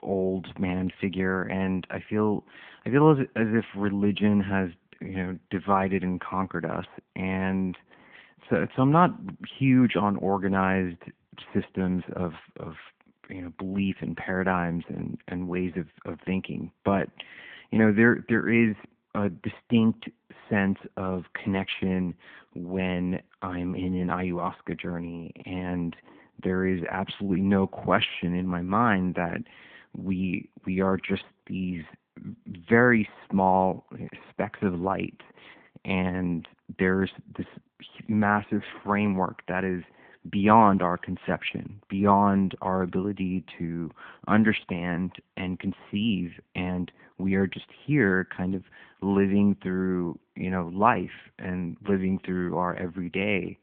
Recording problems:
phone-call audio

